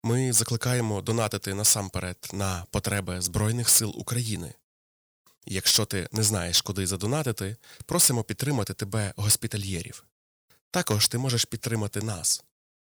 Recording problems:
distortion; slight; 1.6% of the sound clipped

